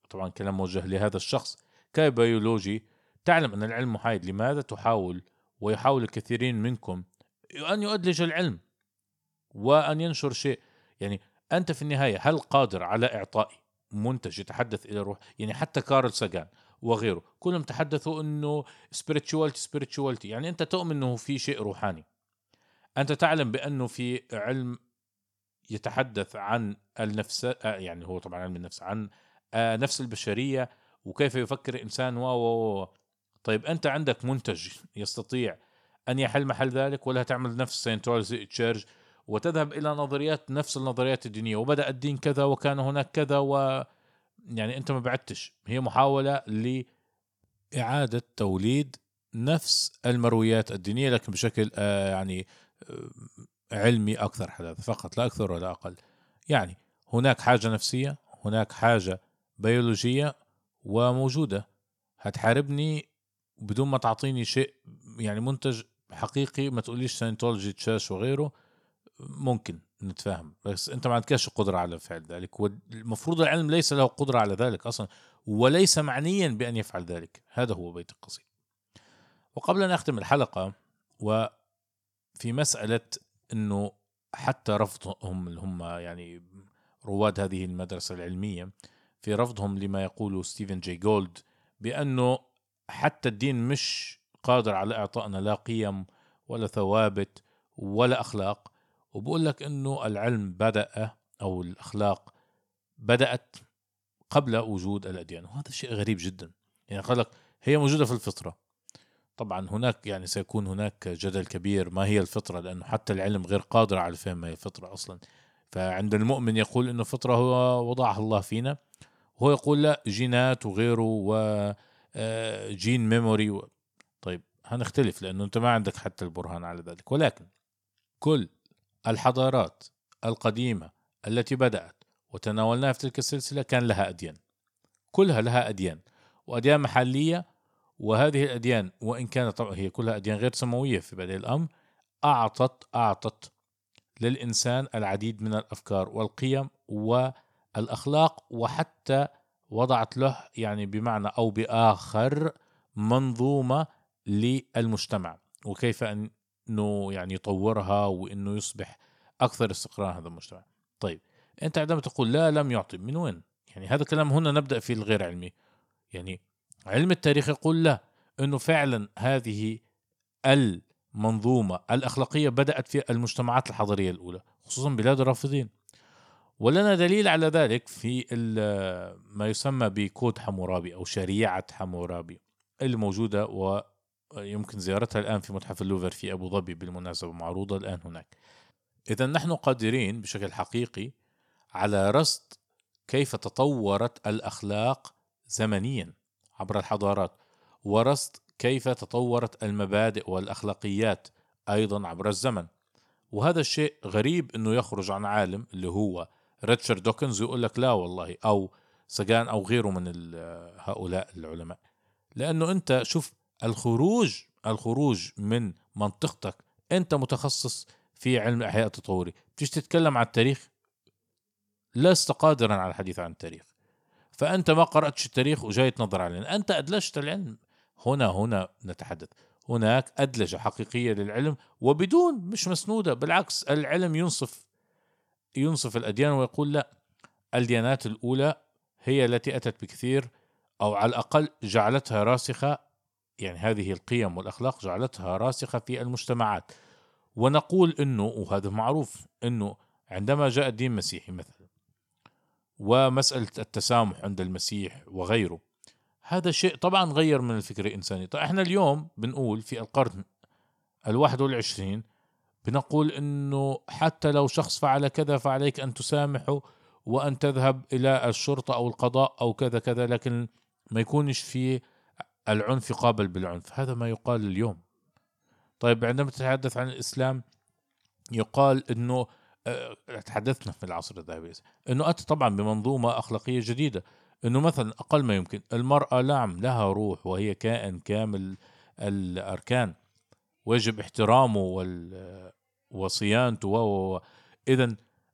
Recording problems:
none

